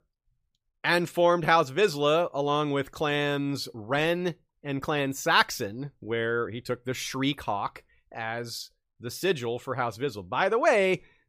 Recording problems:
none

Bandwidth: 15 kHz